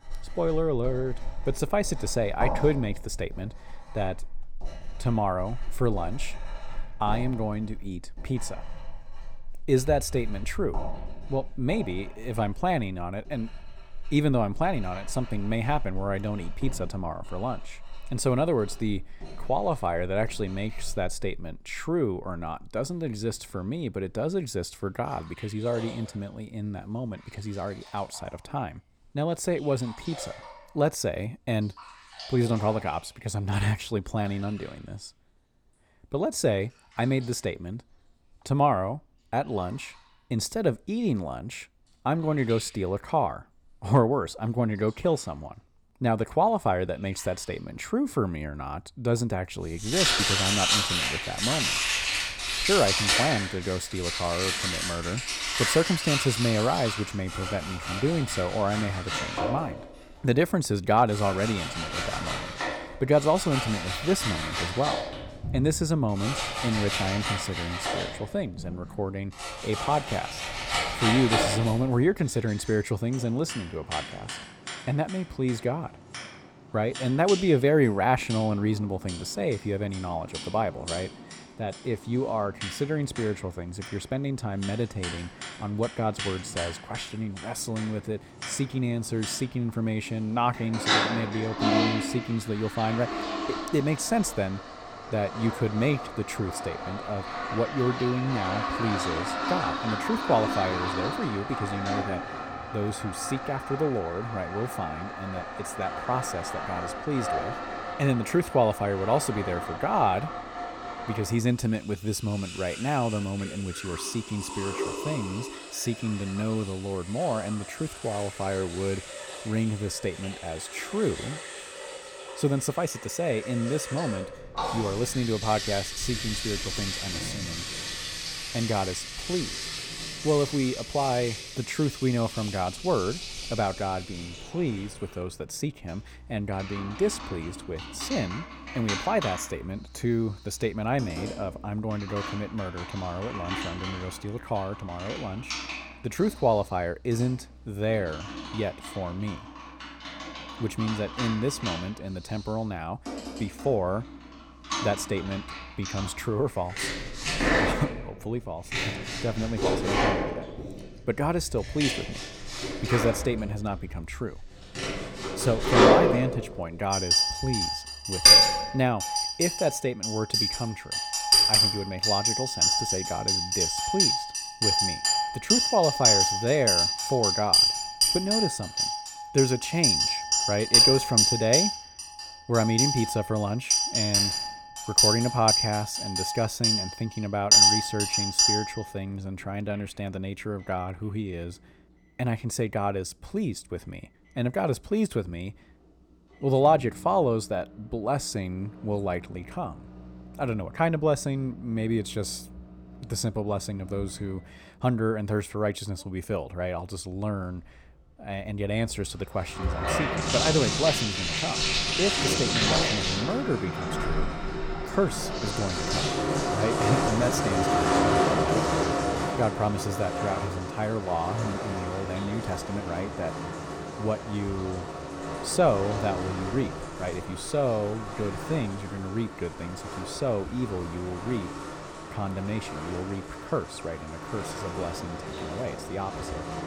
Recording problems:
household noises; very loud; throughout; 2 dB above the speech

